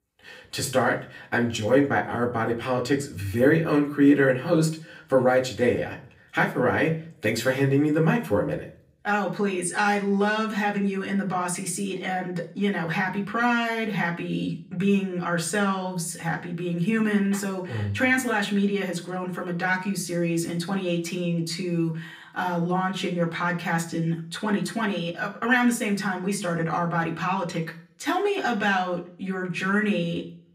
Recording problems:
off-mic speech; far
room echo; very slight; dies away in 0.4 s

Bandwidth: 15.5 kHz